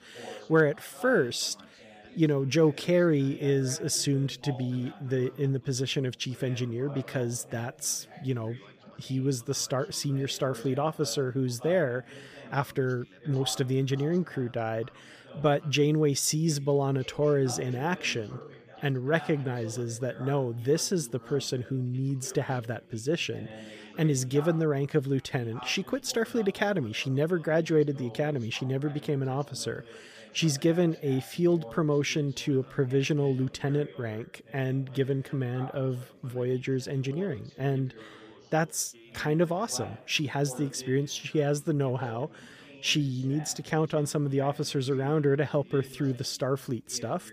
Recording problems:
background chatter; noticeable; throughout; 4 voices, 20 dB below the speech

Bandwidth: 15 kHz